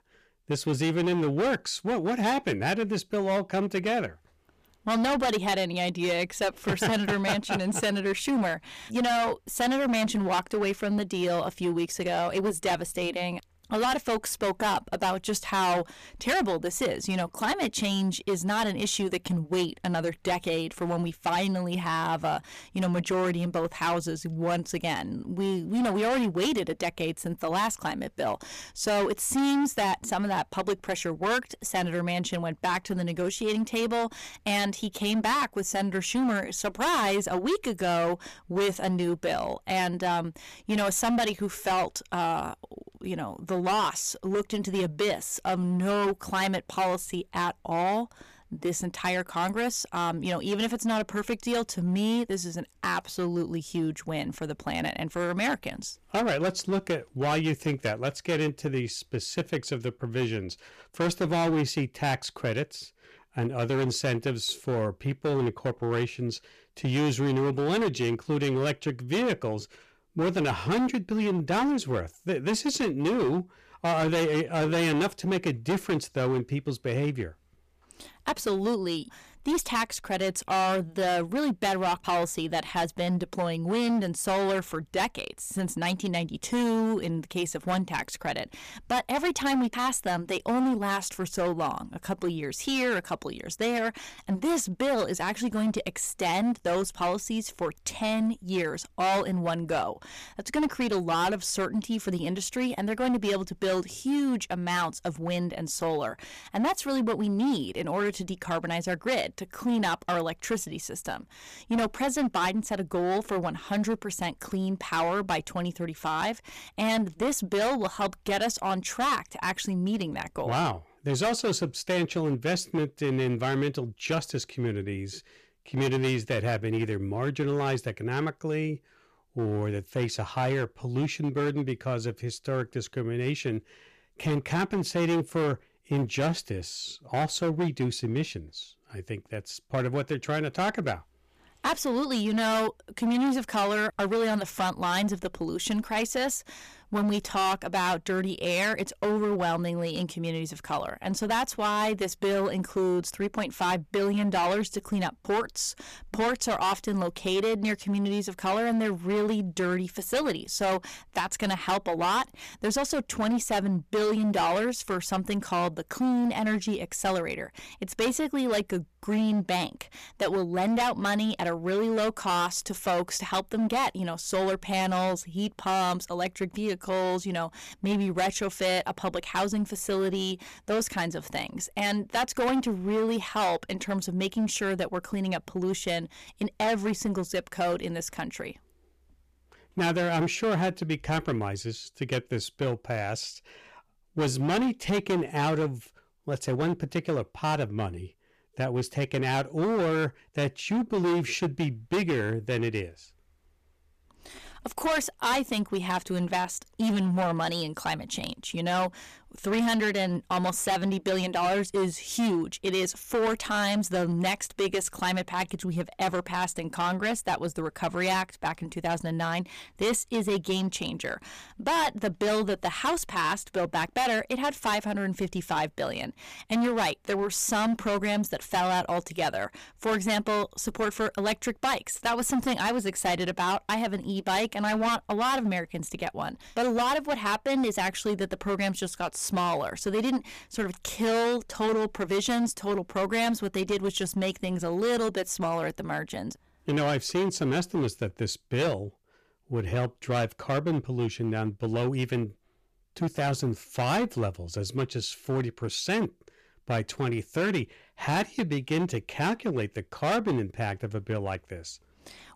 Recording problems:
distortion; heavy; 13% of the sound clipped

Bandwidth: 14.5 kHz